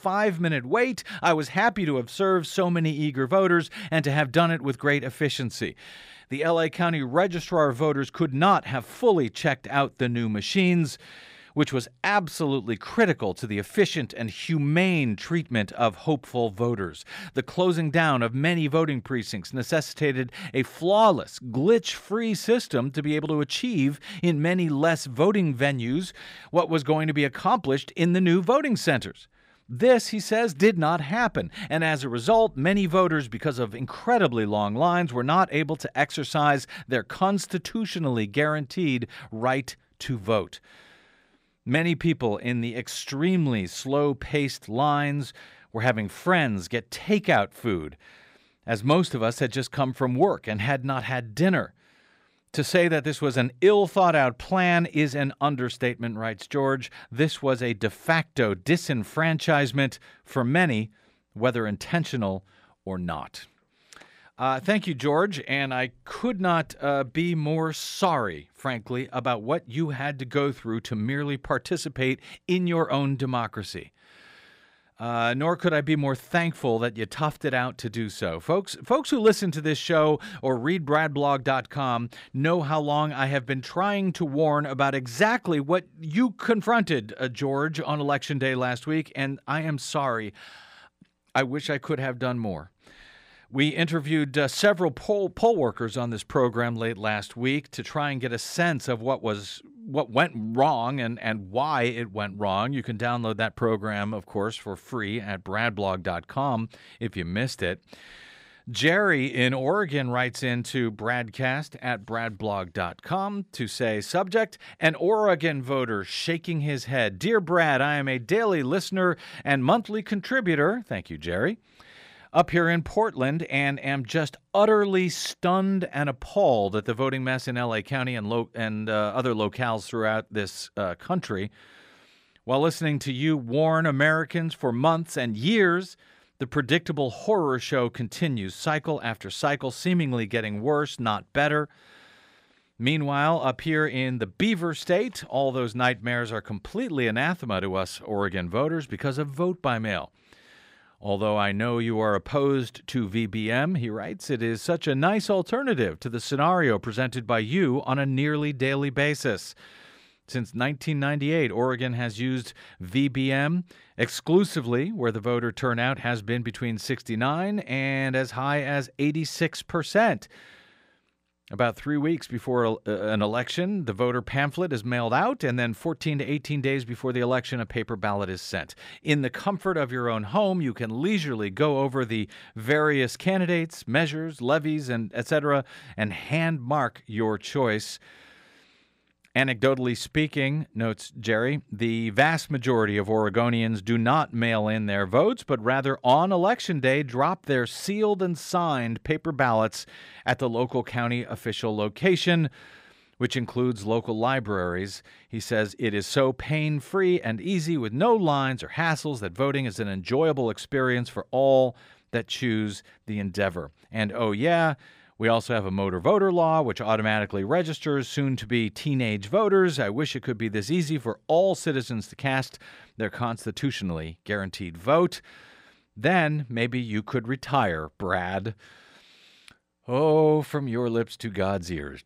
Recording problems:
none

